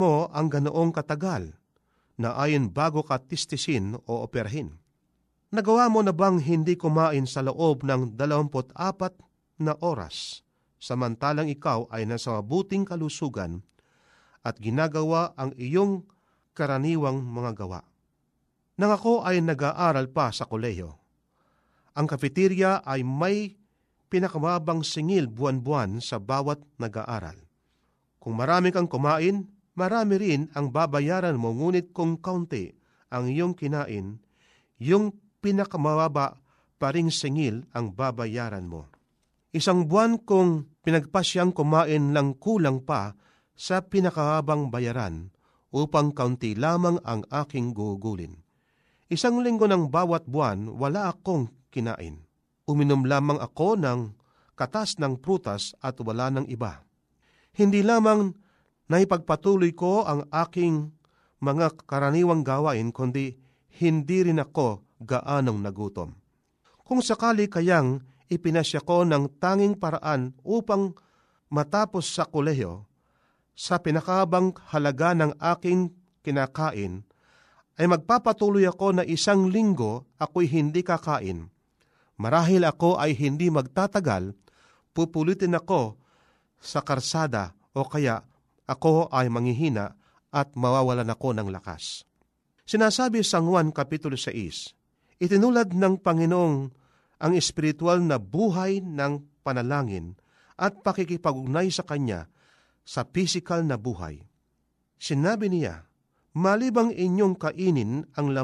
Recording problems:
abrupt cut into speech; at the start and the end

